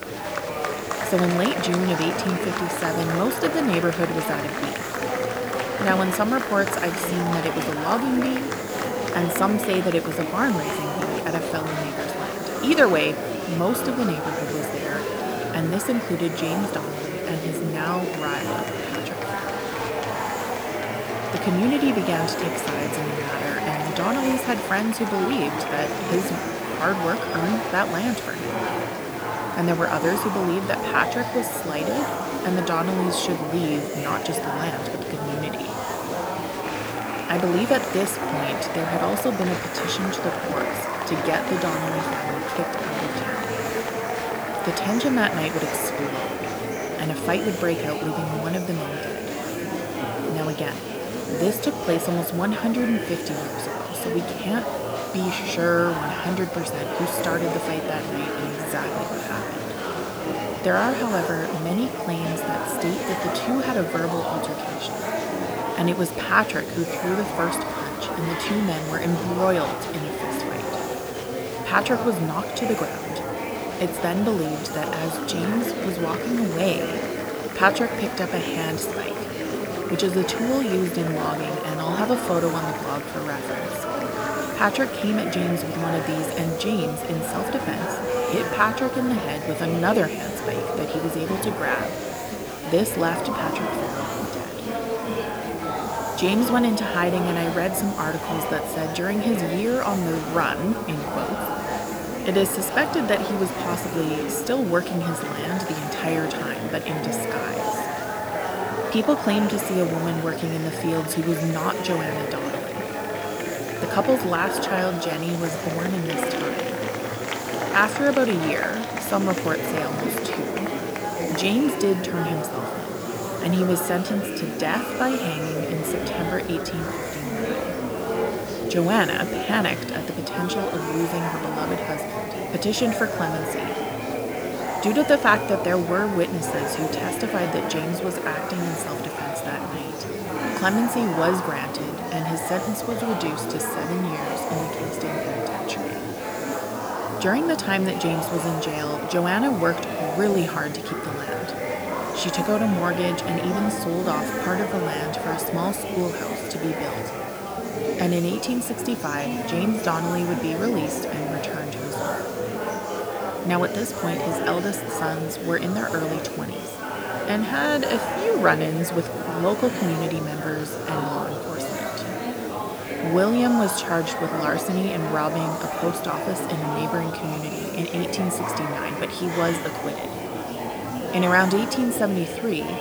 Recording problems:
murmuring crowd; loud; throughout; 3 dB below the speech
hiss; noticeable; throughout; 15 dB below the speech

